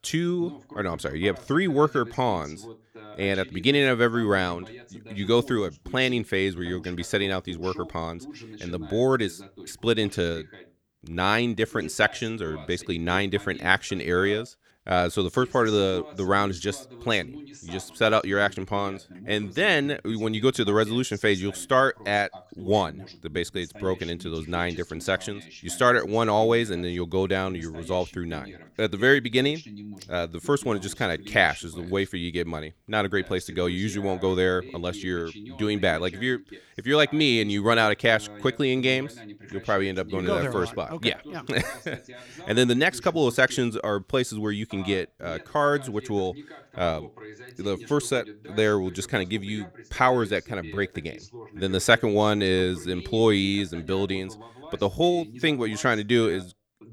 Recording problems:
voice in the background; noticeable; throughout; 20 dB below the speech

